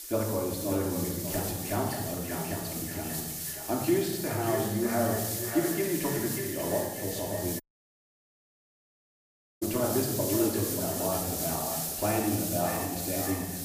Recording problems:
echo of what is said; strong; throughout; 590 ms later, 8 dB below the speech
off-mic speech; far
room echo; noticeable; dies away in 1 s
hiss; loud; throughout; 2 dB below the speech
audio cutting out; at 7.5 s for 2 s

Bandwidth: 15 kHz